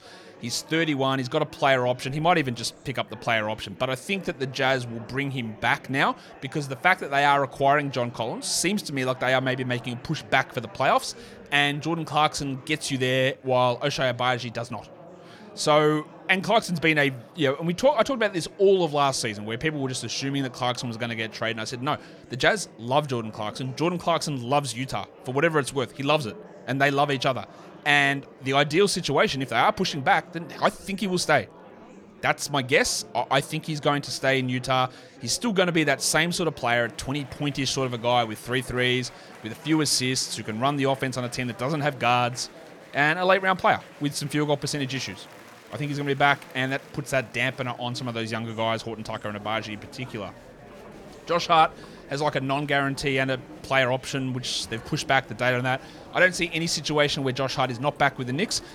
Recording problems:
murmuring crowd; faint; throughout; 20 dB below the speech

